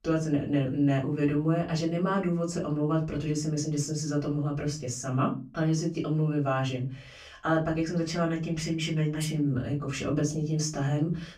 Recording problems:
off-mic speech; far
room echo; very slight; dies away in 0.4 s

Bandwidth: 15 kHz